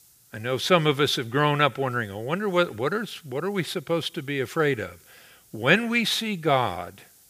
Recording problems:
hiss; faint; throughout; 30 dB below the speech

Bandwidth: 15 kHz